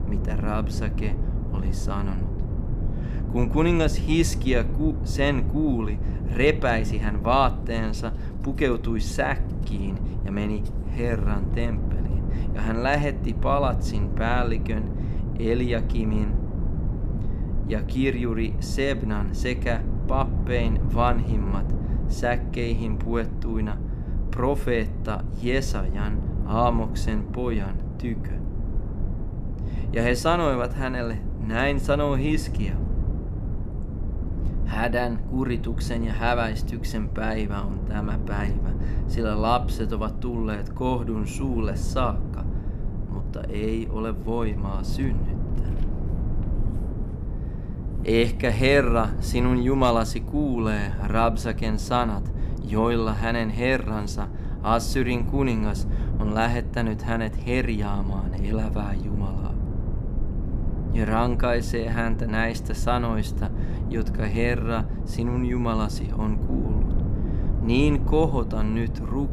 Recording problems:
low rumble; noticeable; throughout; 15 dB below the speech

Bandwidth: 14.5 kHz